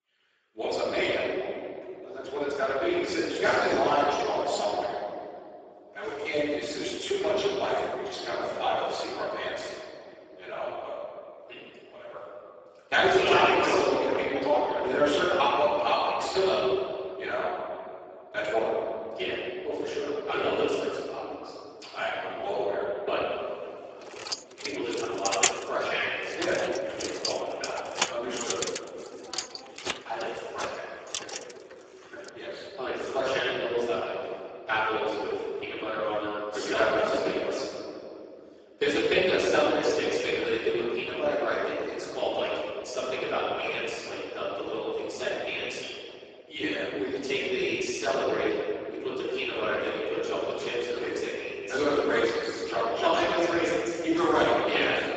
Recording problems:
room echo; strong; dies away in 2.3 s
off-mic speech; far
garbled, watery; badly; nothing above 7.5 kHz
thin; somewhat; fading below 350 Hz
jangling keys; loud; from 24 to 31 s; peak 3 dB above the speech

